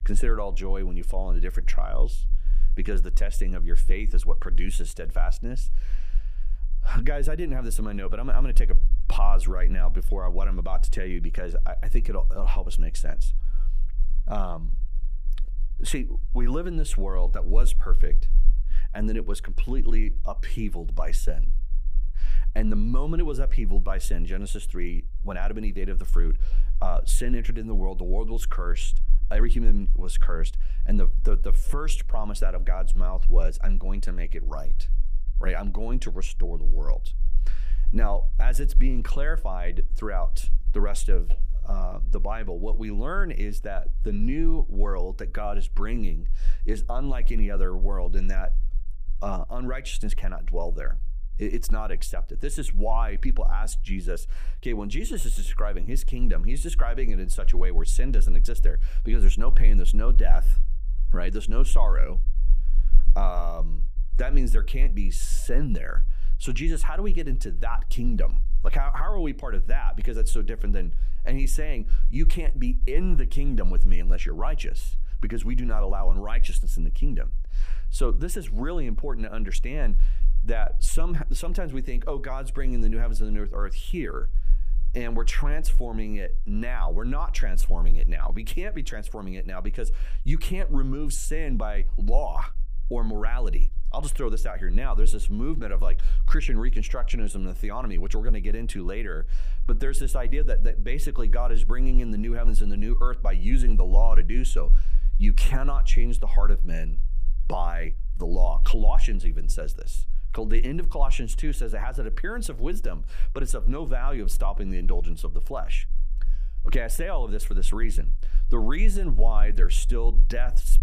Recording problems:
low rumble; faint; throughout; 25 dB below the speech

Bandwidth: 15 kHz